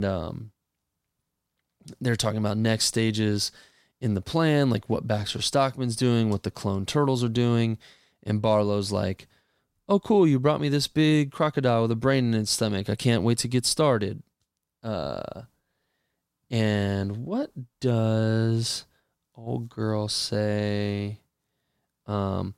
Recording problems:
abrupt cut into speech; at the start

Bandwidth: 16 kHz